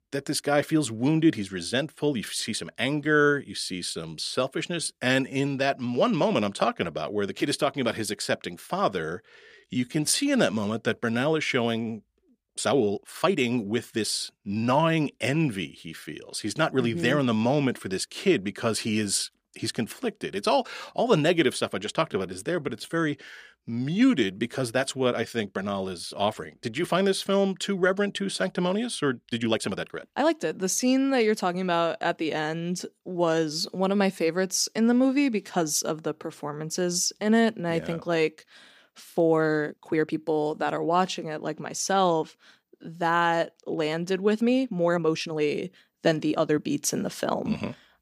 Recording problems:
uneven, jittery; strongly; from 4.5 to 47 s

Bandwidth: 15 kHz